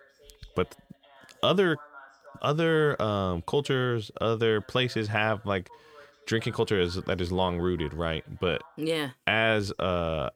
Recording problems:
voice in the background; faint; throughout; 25 dB below the speech

